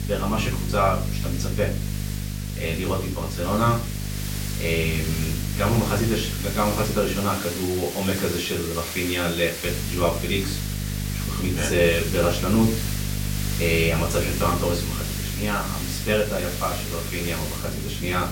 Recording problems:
off-mic speech; far
room echo; slight; dies away in 0.4 s
hiss; loud; throughout; 7 dB below the speech
electrical hum; noticeable; until 7 s and from 9.5 s on; 50 Hz, 15 dB below the speech

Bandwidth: 16.5 kHz